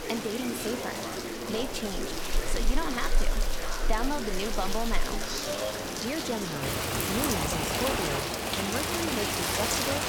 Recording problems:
rain or running water; very loud; throughout; 3 dB above the speech
chatter from many people; loud; throughout; 3 dB below the speech

